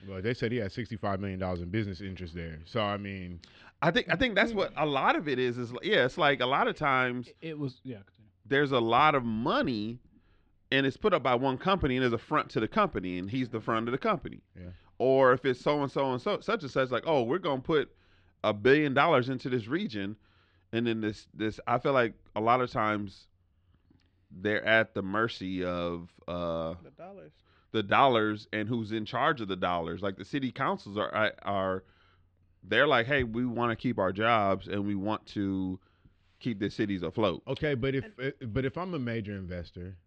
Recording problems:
muffled; slightly; fading above 3.5 kHz

